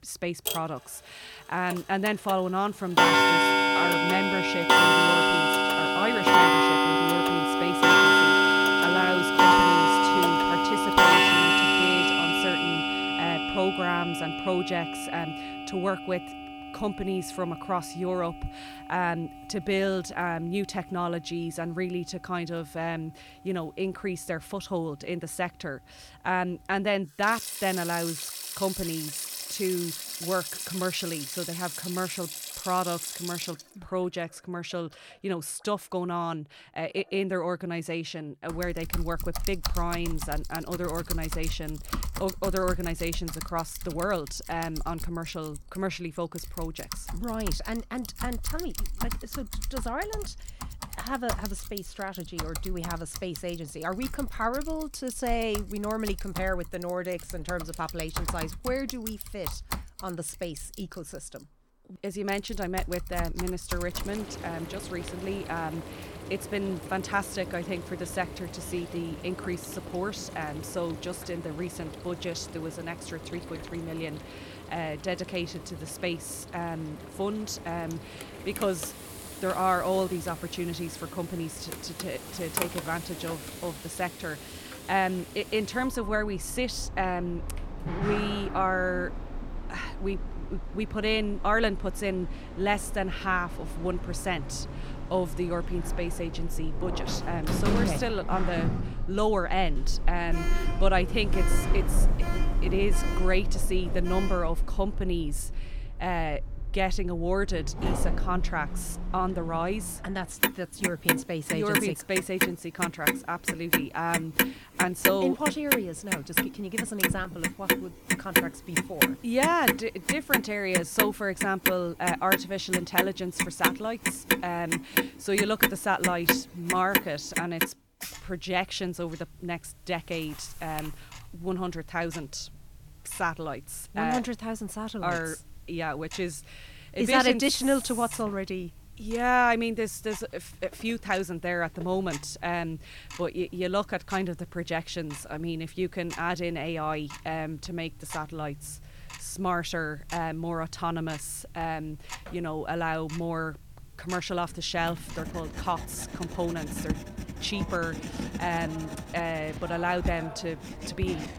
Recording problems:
household noises; very loud; throughout; 4 dB above the speech

